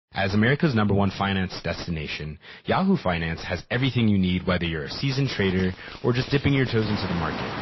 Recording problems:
distortion; slight; 10 dB below the speech
garbled, watery; slightly; nothing above 5.5 kHz
rain or running water; noticeable; from 5.5 s on; 10 dB below the speech

